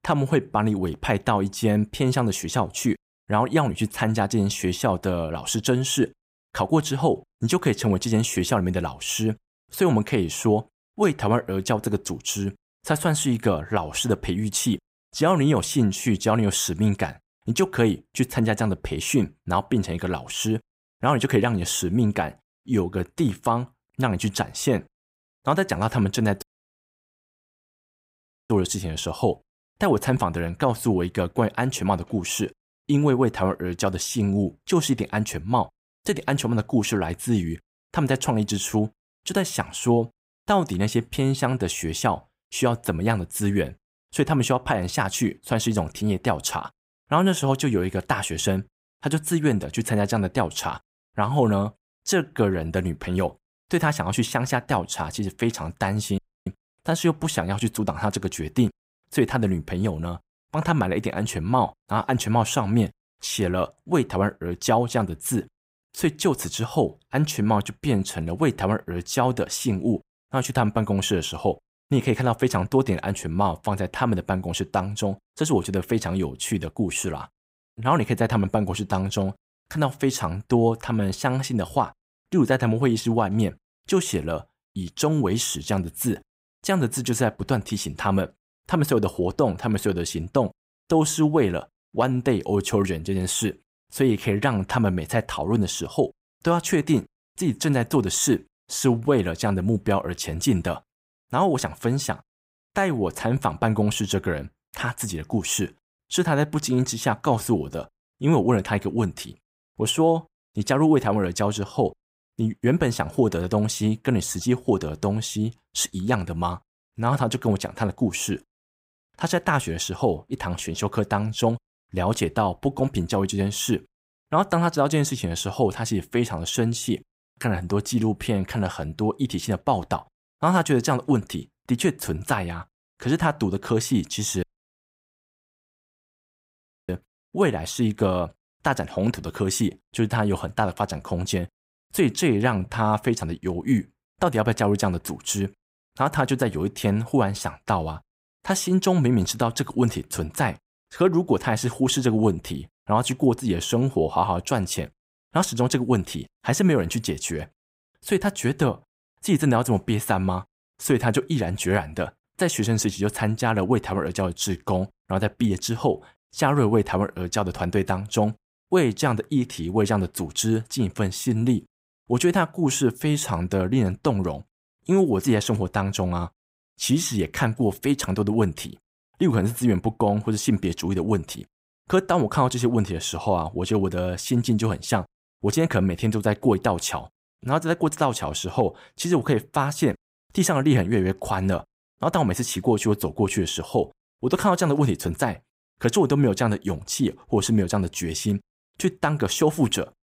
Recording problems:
audio cutting out; at 26 s for 2 s, at 56 s and at 2:14 for 2.5 s

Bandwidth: 15.5 kHz